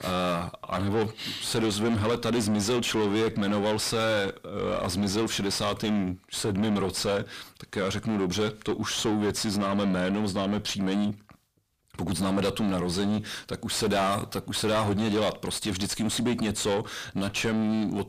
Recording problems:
distortion; heavy; 5 dB below the speech

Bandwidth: 15 kHz